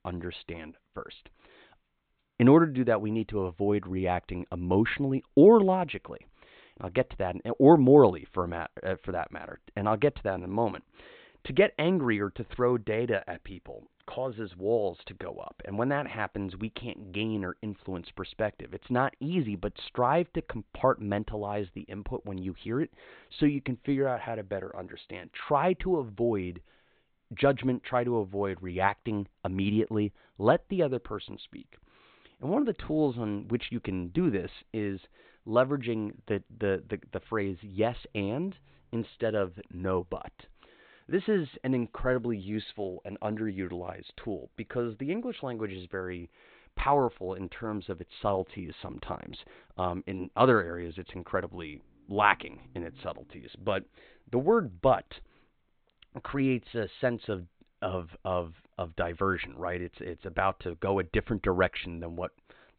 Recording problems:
high frequencies cut off; severe; nothing above 4 kHz

